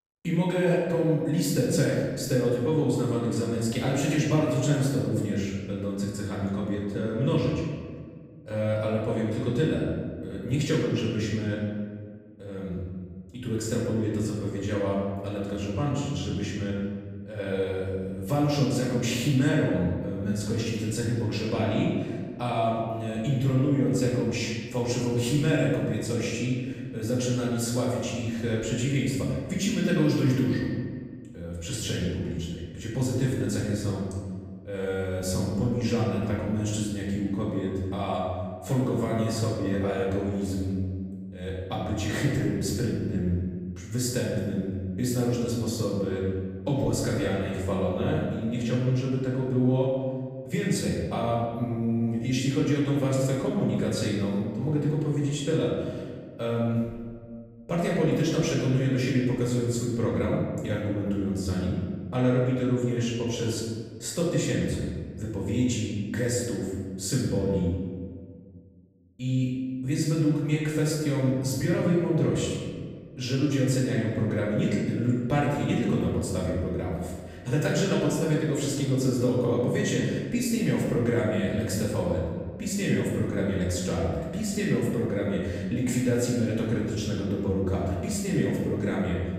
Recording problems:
off-mic speech; far
room echo; noticeable; dies away in 1.5 s

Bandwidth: 15.5 kHz